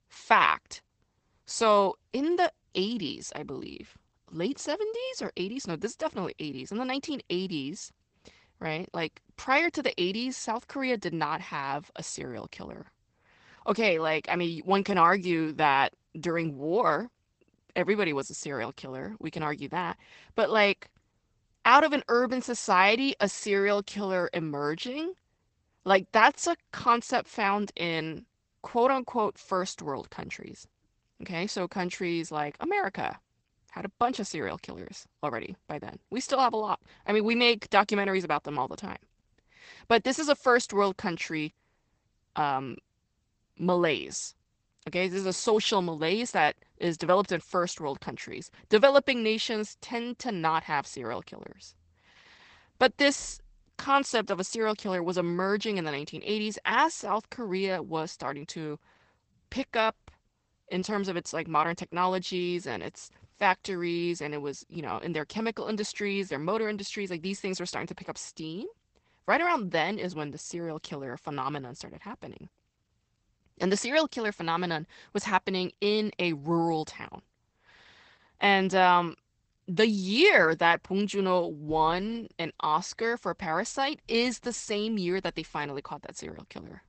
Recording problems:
garbled, watery; badly; nothing above 8 kHz

